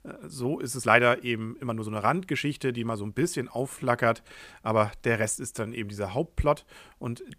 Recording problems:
uneven, jittery; strongly; from 1 to 6.5 s

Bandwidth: 15 kHz